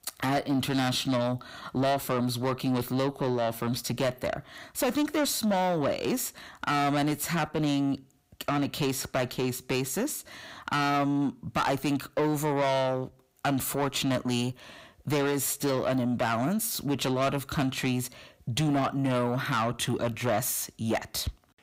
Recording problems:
distortion; heavy; 8 dB below the speech

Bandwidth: 15.5 kHz